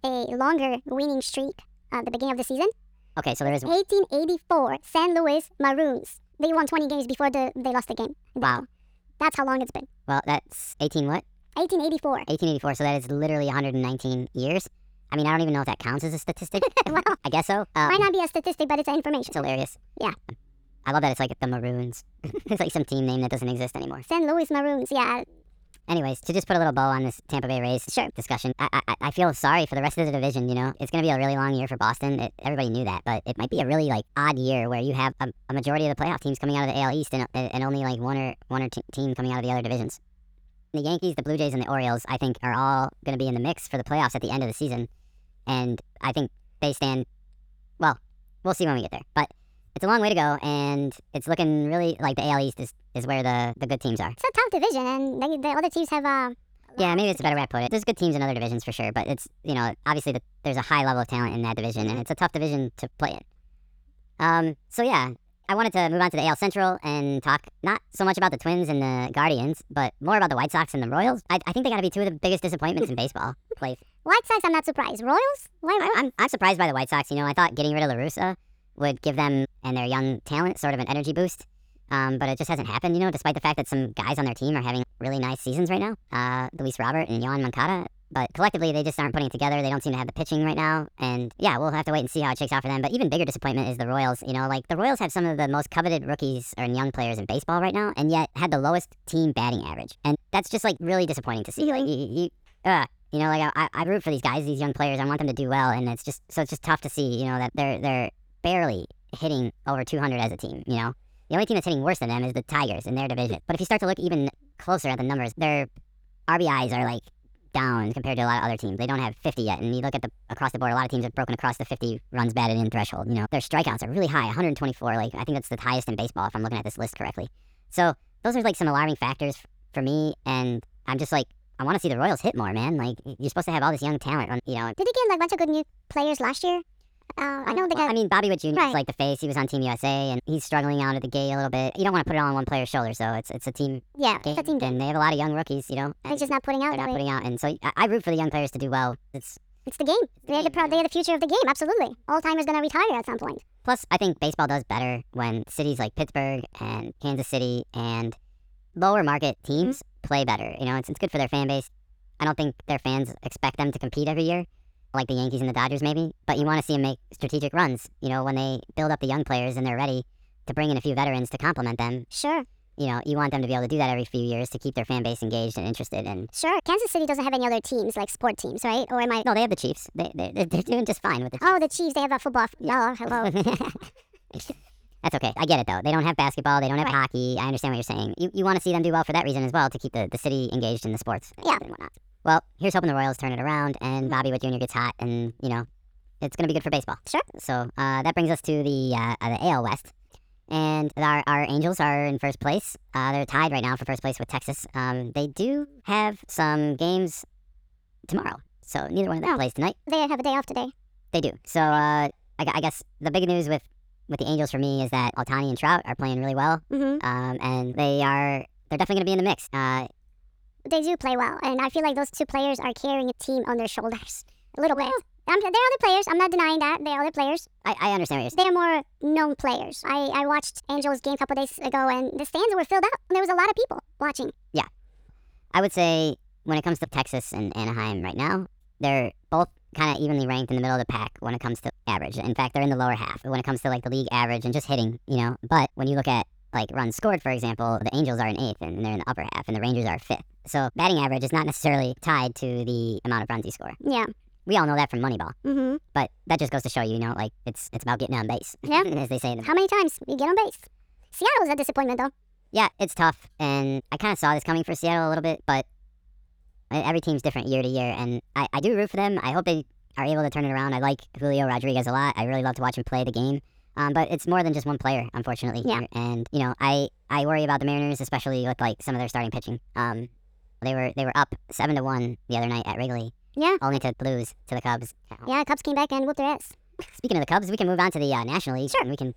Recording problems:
wrong speed and pitch; too fast and too high; 1.5 times normal speed

